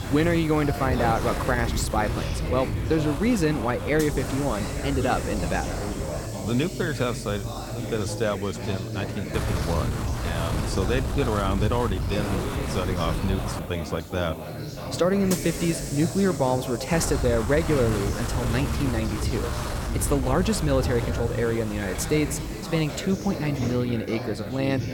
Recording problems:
wind noise on the microphone; heavy; until 6.5 s, from 9.5 to 14 s and from 17 to 23 s; 8 dB below the speech
background chatter; loud; throughout; 2 voices, 7 dB below the speech
hiss; noticeable; throughout; 10 dB below the speech

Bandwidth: 17 kHz